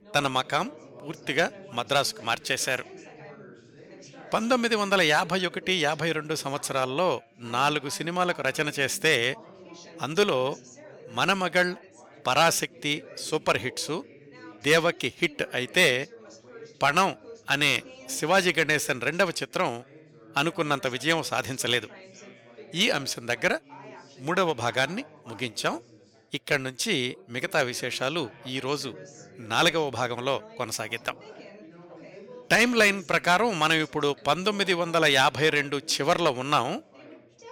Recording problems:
background chatter; faint; throughout; 4 voices, 20 dB below the speech

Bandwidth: 18.5 kHz